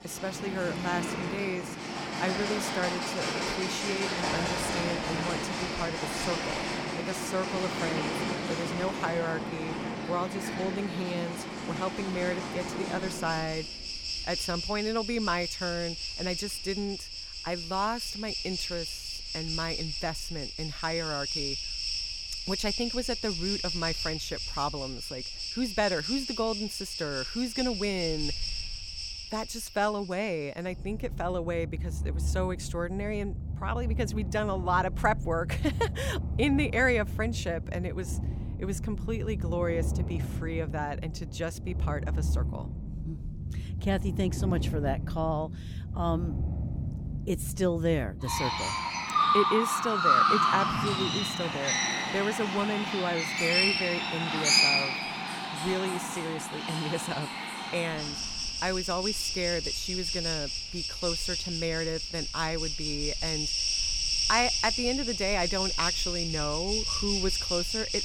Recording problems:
animal sounds; very loud; throughout; 2 dB above the speech

